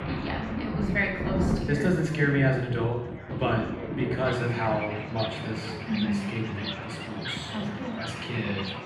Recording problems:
off-mic speech; far
room echo; noticeable; dies away in 0.8 s
rain or running water; loud; throughout; 5 dB below the speech
background chatter; noticeable; throughout; 3 voices, 15 dB below the speech

